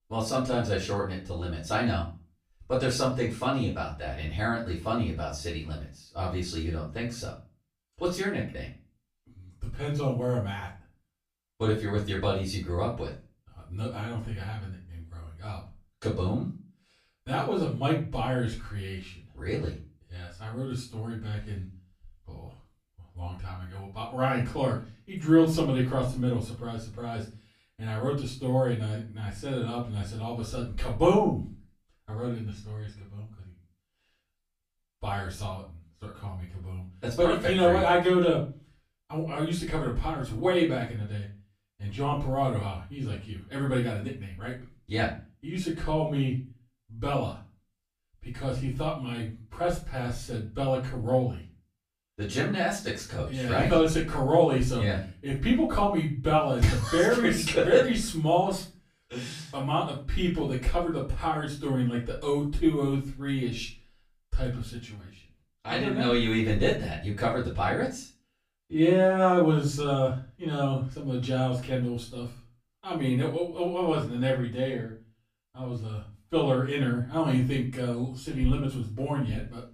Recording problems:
off-mic speech; far
room echo; slight; dies away in 0.3 s

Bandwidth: 15 kHz